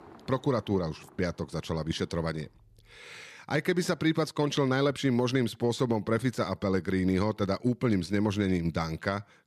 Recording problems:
traffic noise; faint; until 3 s; 30 dB below the speech

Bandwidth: 14 kHz